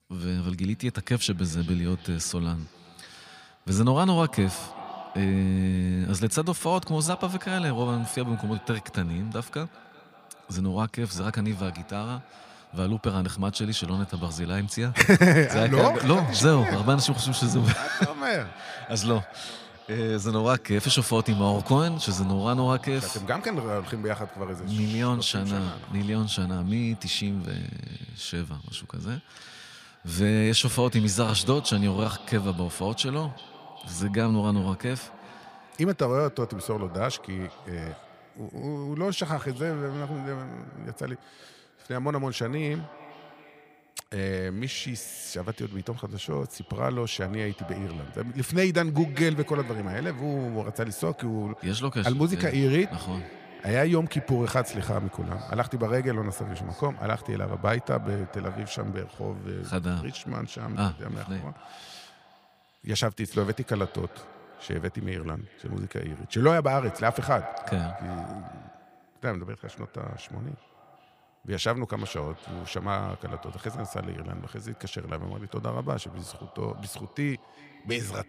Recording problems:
echo of what is said; noticeable; throughout; 380 ms later, 15 dB below the speech

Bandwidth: 15 kHz